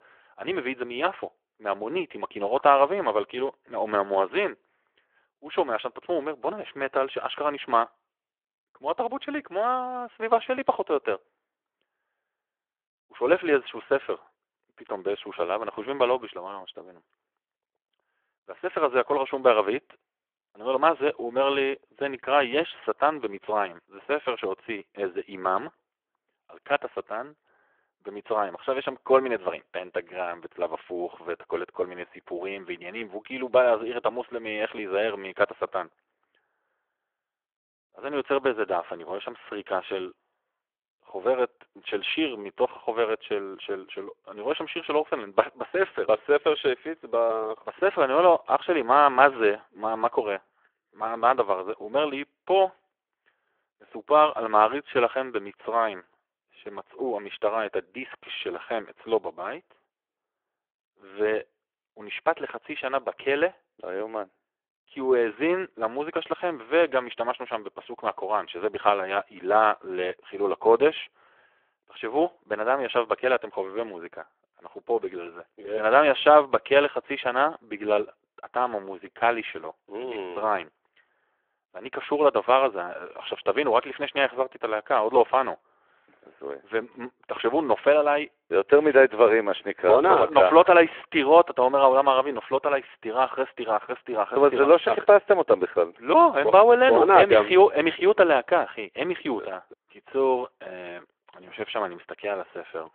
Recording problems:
phone-call audio

